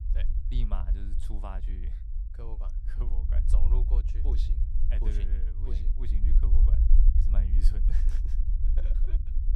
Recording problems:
low rumble; loud; throughout; 2 dB below the speech

